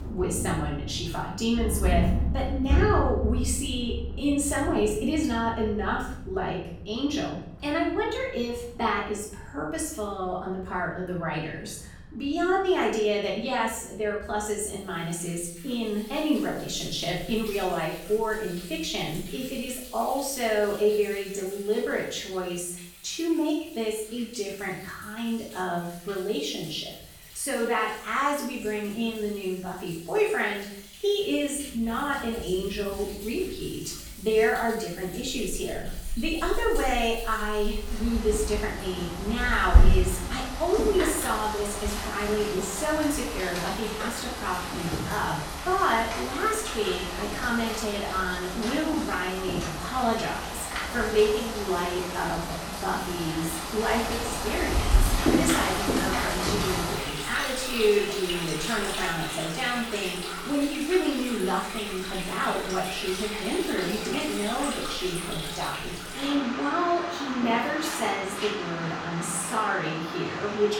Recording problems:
off-mic speech; far
room echo; noticeable; dies away in 0.6 s
rain or running water; loud; throughout; 3 dB below the speech

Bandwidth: 18 kHz